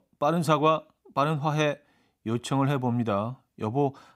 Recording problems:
none

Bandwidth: 15.5 kHz